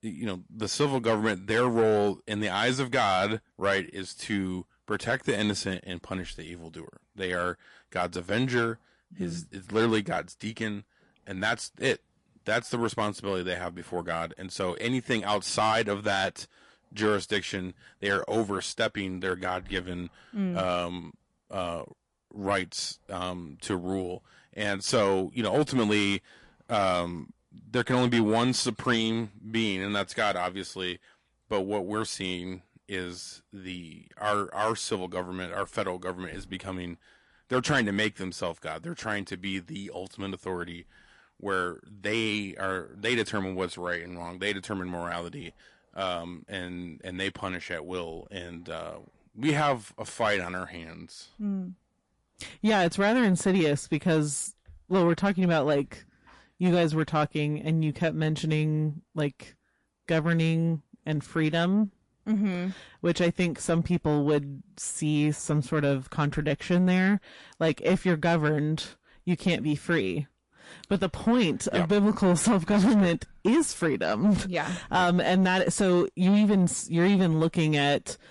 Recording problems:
distortion; slight; 10 dB below the speech
garbled, watery; slightly; nothing above 11 kHz

